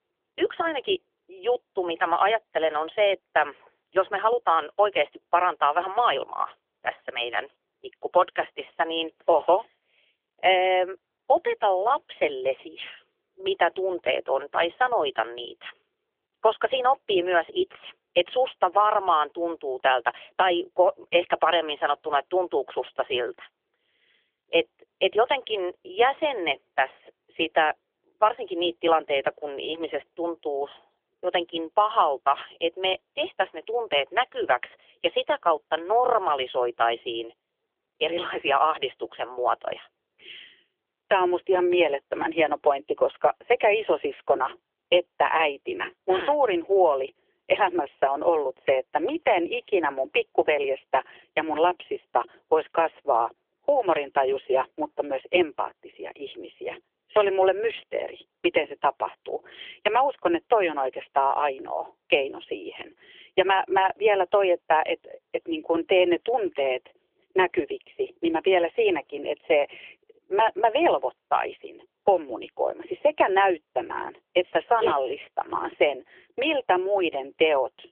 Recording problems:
phone-call audio; nothing above 3.5 kHz

